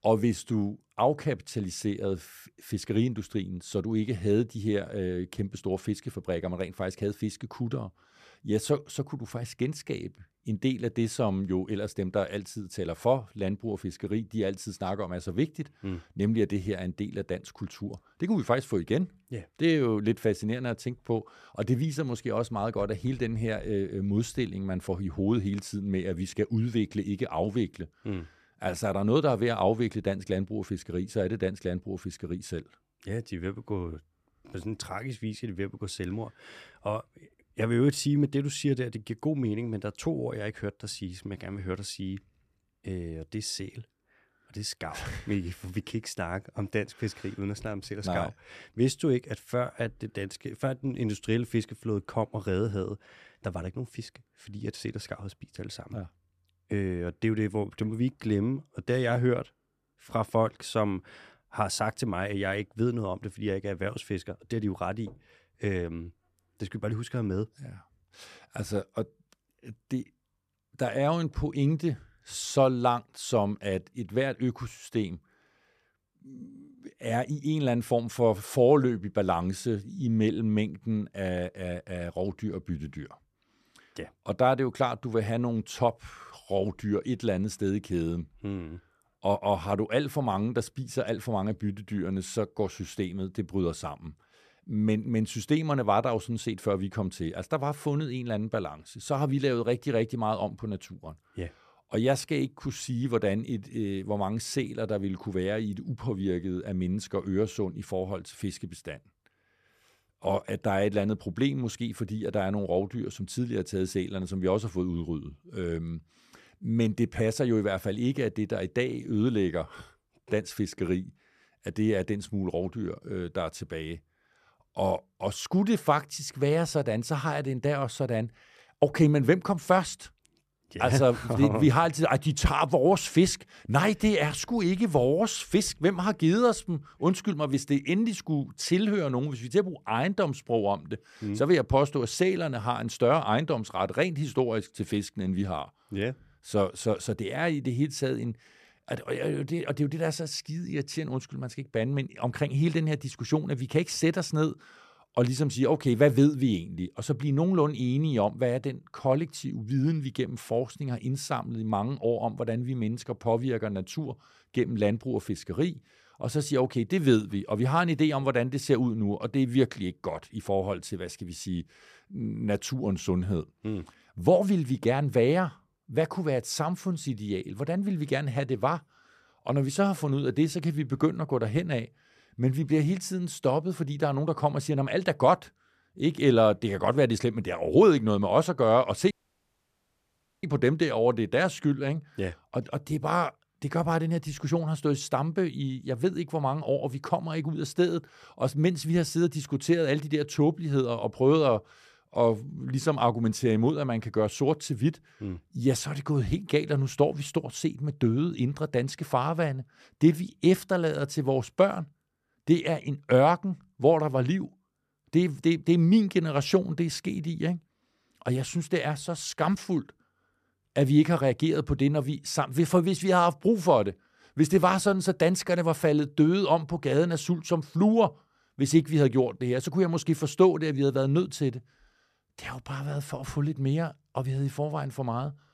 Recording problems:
audio cutting out; at 3:09 for 1.5 s

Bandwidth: 14 kHz